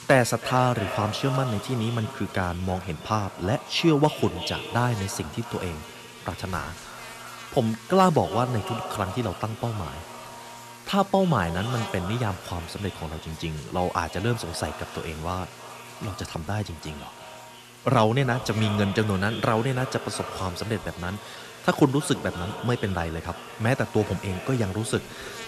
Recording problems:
echo of what is said; strong; throughout; 330 ms later, 10 dB below the speech
electrical hum; noticeable; throughout; 60 Hz, 15 dB below the speech

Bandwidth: 13.5 kHz